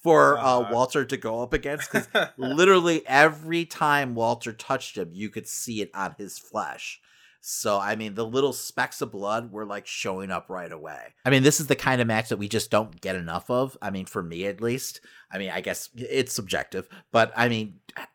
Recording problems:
none

